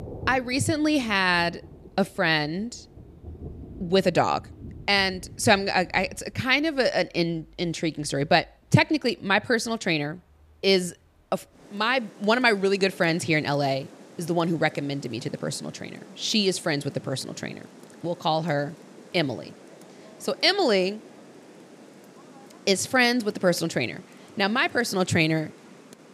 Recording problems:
rain or running water; faint; throughout; 20 dB below the speech

